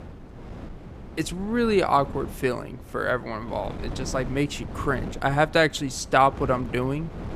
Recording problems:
wind noise on the microphone; occasional gusts; 20 dB below the speech

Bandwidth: 14.5 kHz